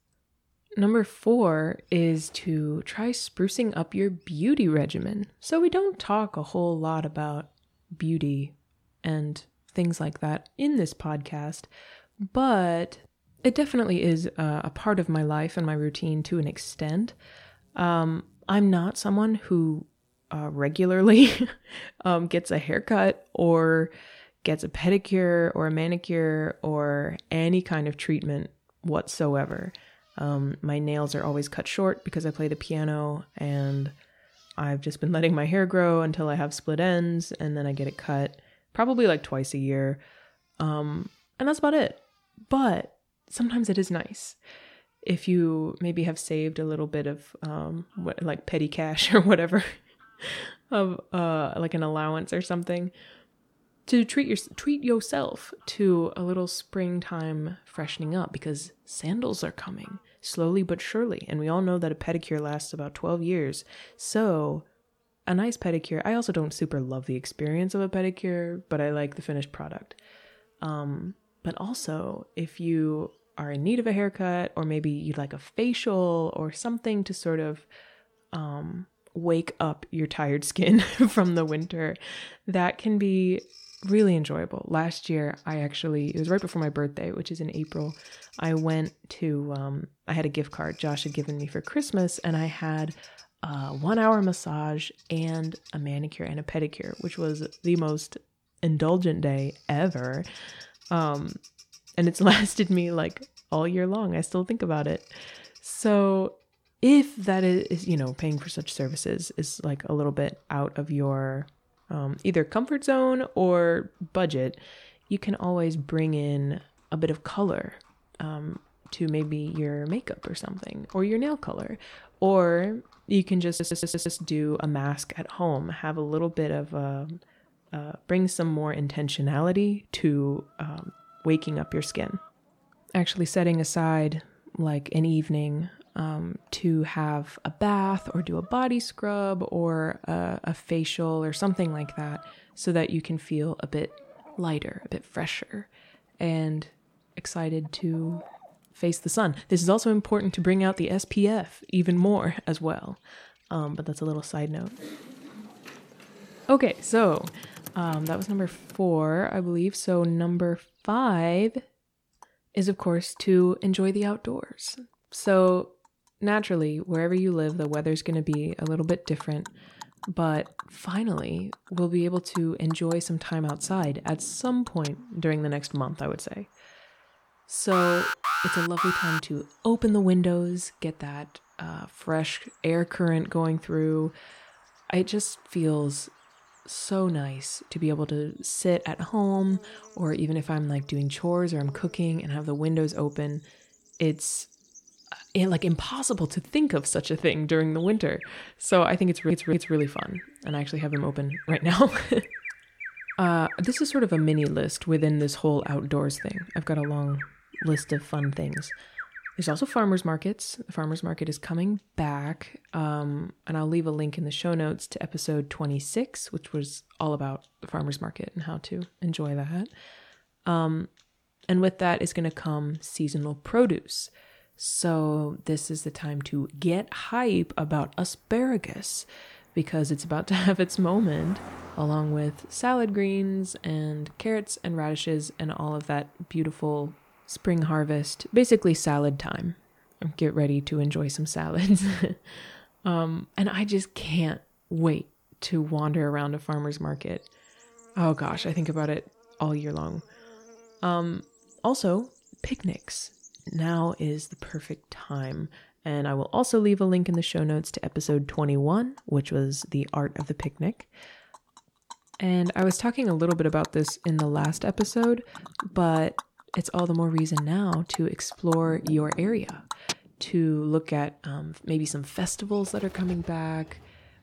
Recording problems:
animal sounds; noticeable; throughout; 20 dB below the speech
audio stuttering; at 2:03 and at 3:19
keyboard typing; faint; from 2:35 to 2:39; peak 15 dB below the speech
alarm; loud; from 2:58 to 2:59; peak 2 dB above the speech

